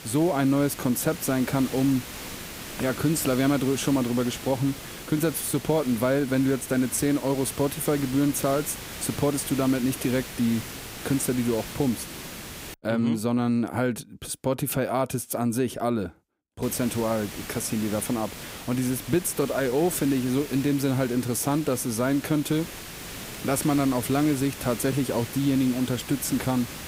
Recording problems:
hiss; noticeable; until 13 s and from 17 s on; 10 dB below the speech

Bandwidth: 15.5 kHz